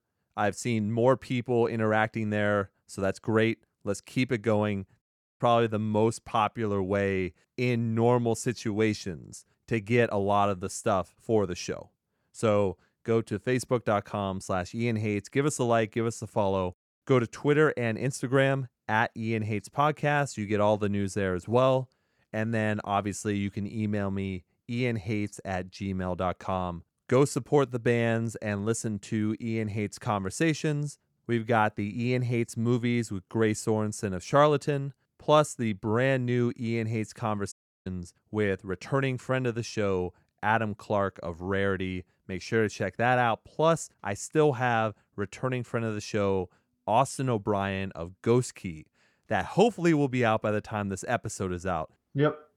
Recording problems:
audio cutting out; at 5 s and at 38 s

